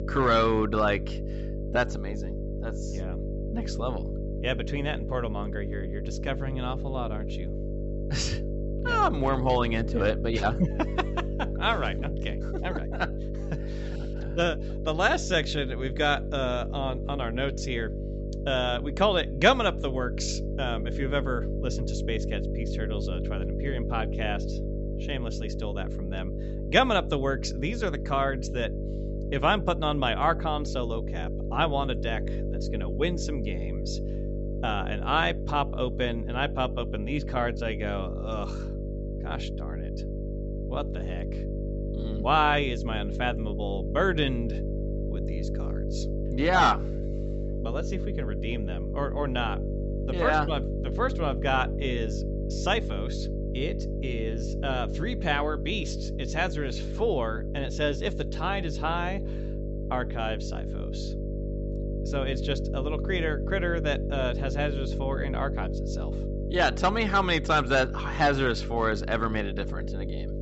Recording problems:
high frequencies cut off; noticeable; nothing above 7.5 kHz
electrical hum; noticeable; throughout; 50 Hz, 10 dB below the speech

